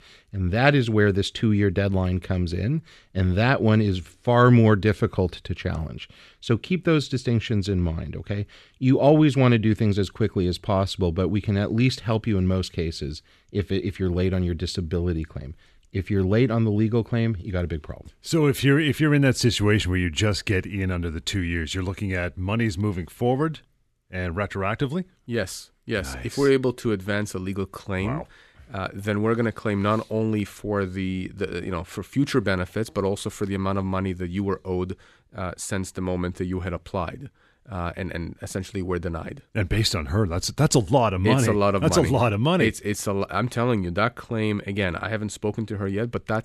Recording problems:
none

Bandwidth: 13.5 kHz